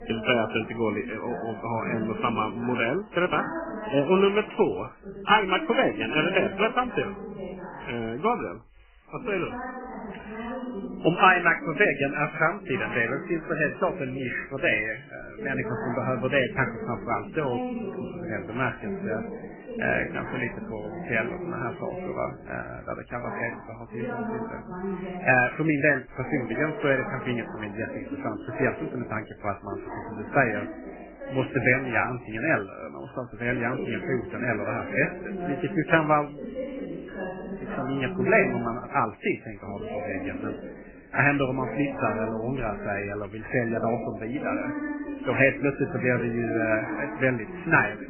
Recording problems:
garbled, watery; badly; nothing above 3 kHz
voice in the background; loud; throughout; 9 dB below the speech

